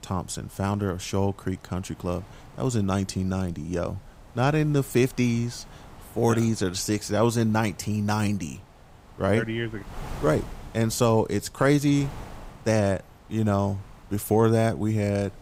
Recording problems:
wind noise on the microphone; occasional gusts; 20 dB below the speech

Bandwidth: 15.5 kHz